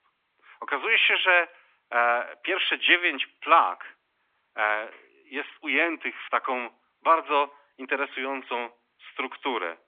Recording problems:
thin; somewhat; fading below 250 Hz
phone-call audio; nothing above 3.5 kHz

